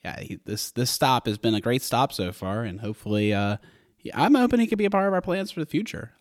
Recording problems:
none

